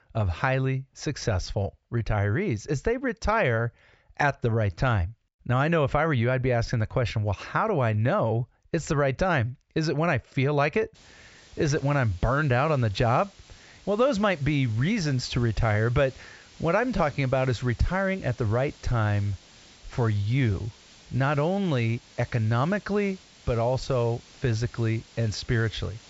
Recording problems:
high frequencies cut off; noticeable; nothing above 8 kHz
hiss; faint; from 11 s on; 25 dB below the speech

